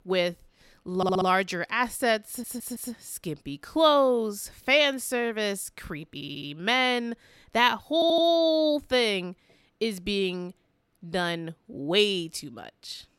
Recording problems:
audio stuttering; 4 times, first at 1 s

